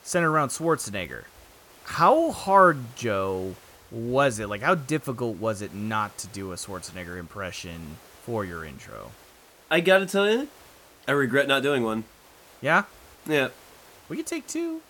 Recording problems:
hiss; faint; throughout; 25 dB below the speech

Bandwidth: 17.5 kHz